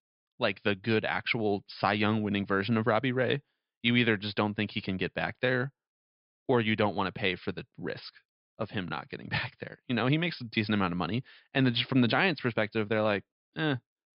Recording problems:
high frequencies cut off; noticeable; nothing above 5.5 kHz

